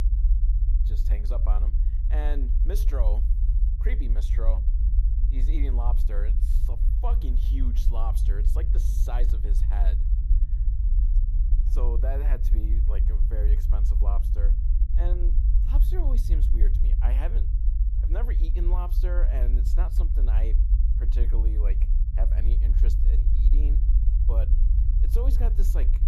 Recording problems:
low rumble; loud; throughout; 5 dB below the speech

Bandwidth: 13.5 kHz